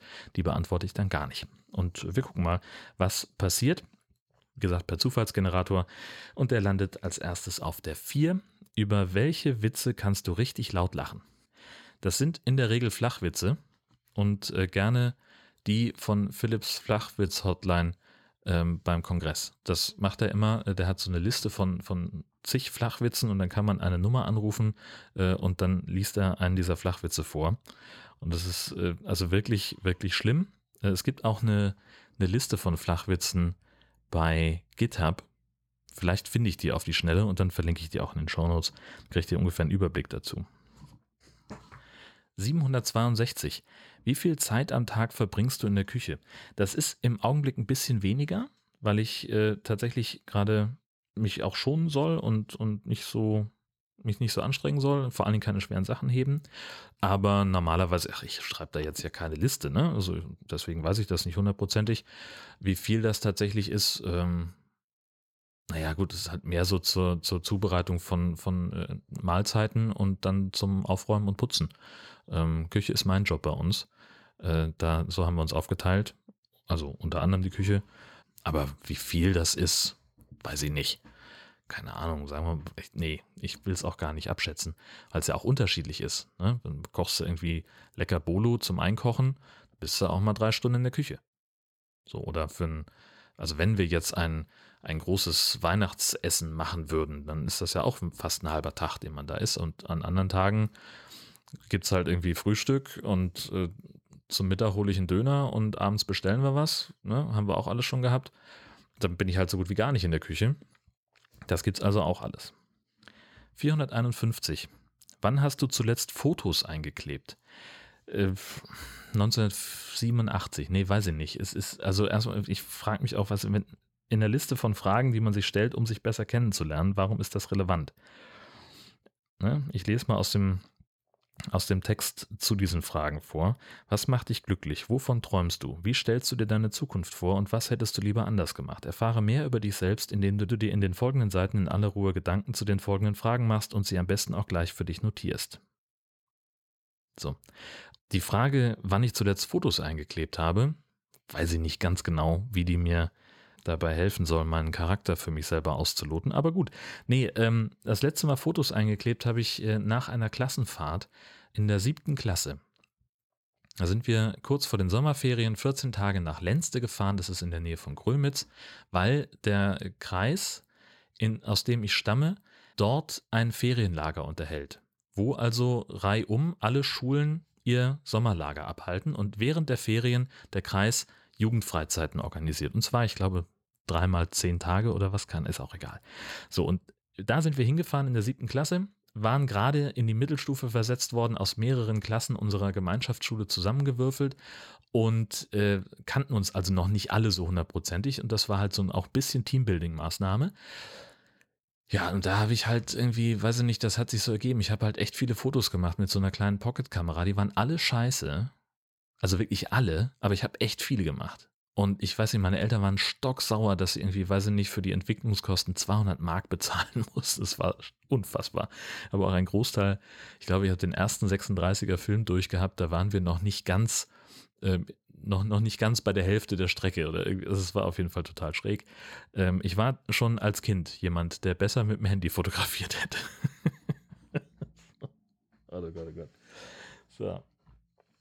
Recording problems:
uneven, jittery; strongly; from 17 s to 3:07

